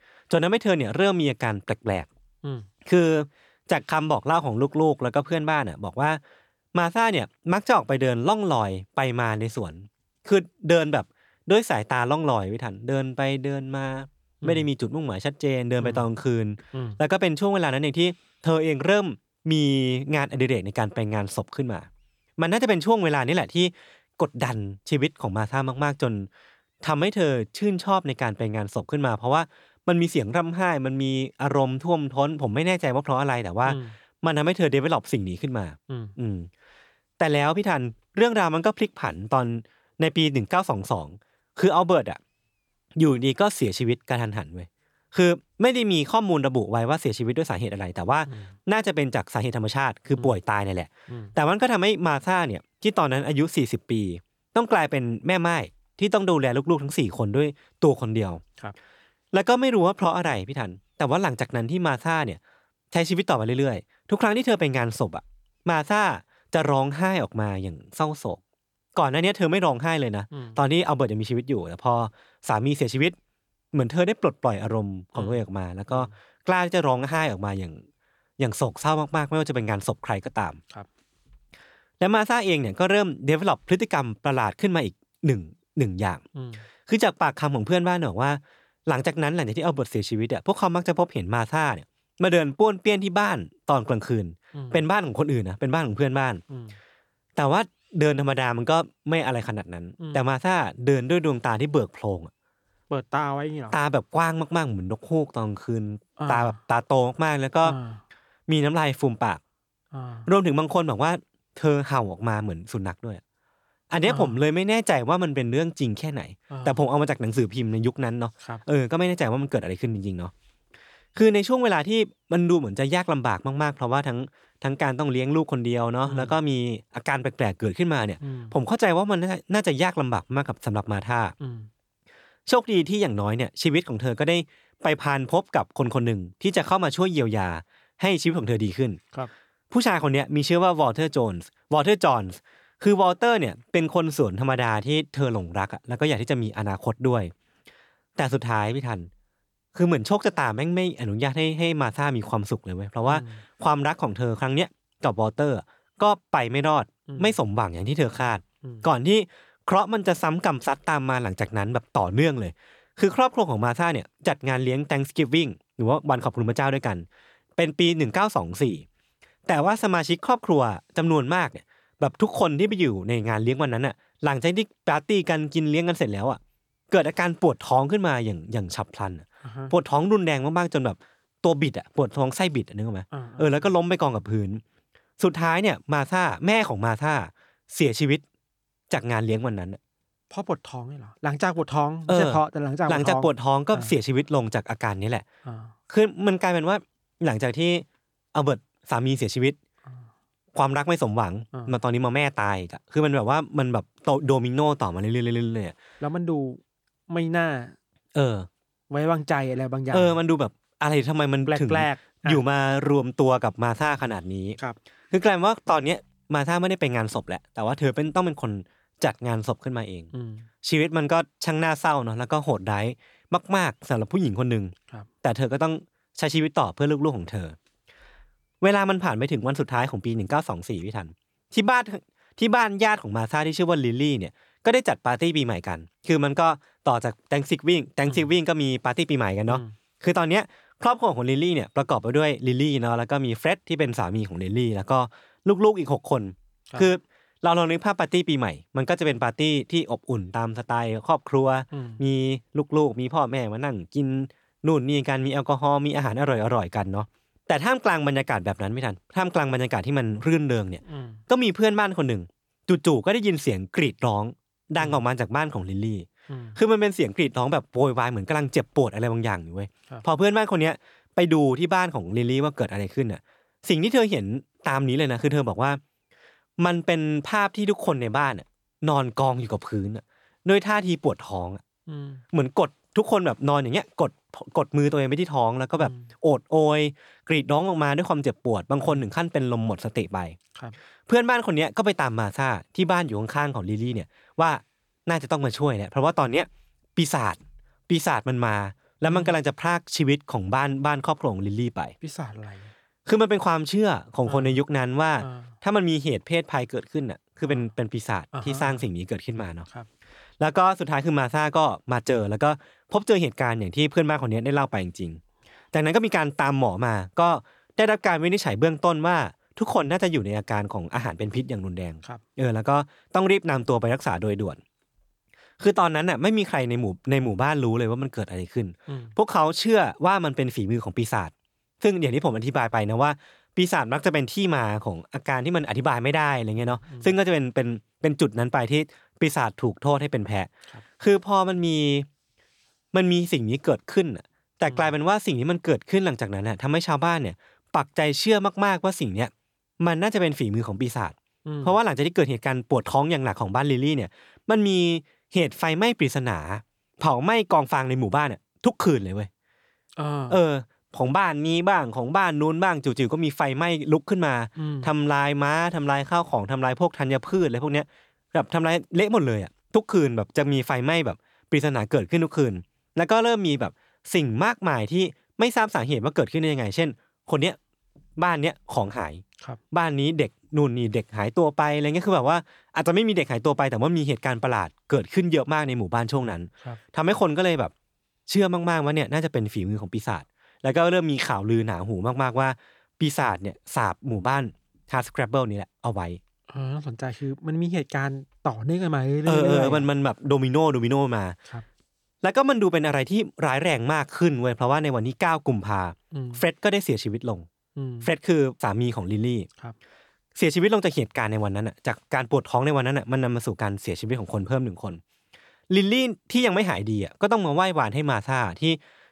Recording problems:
none

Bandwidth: 18.5 kHz